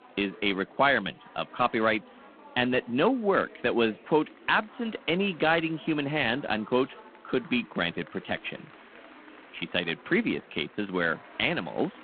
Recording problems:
phone-call audio; poor line
chatter from many people; faint; throughout; 20 dB below the speech

